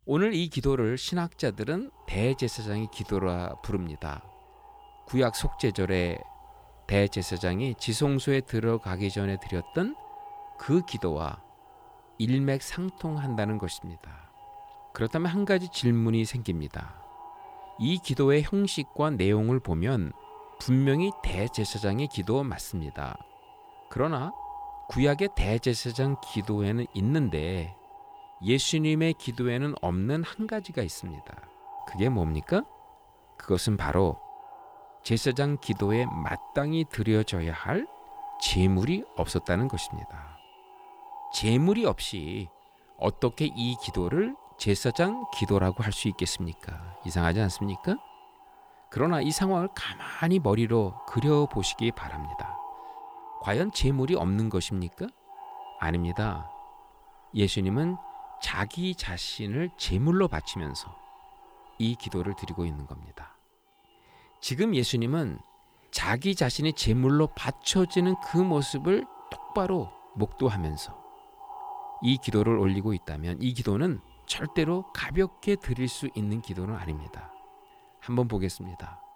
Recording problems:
echo of what is said; noticeable; throughout; 600 ms later, 20 dB below the speech

